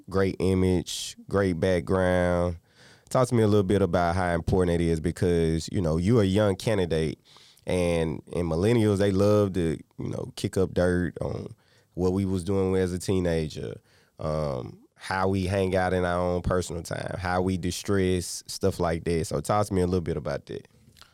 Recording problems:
none

